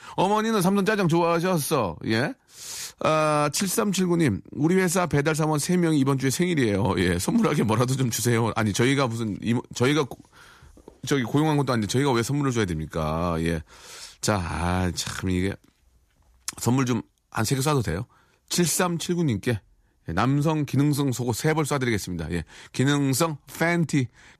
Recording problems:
none

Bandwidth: 14.5 kHz